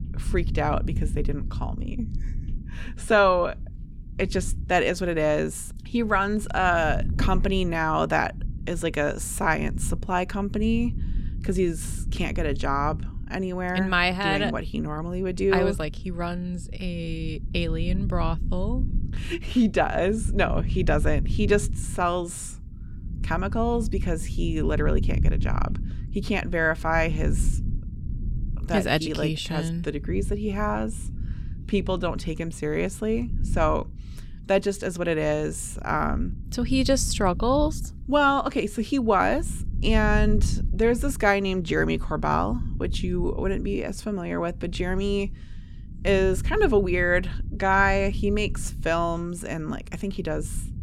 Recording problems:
low rumble; faint; throughout; 20 dB below the speech

